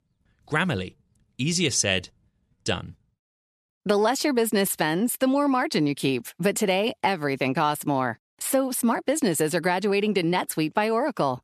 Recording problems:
none

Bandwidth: 14 kHz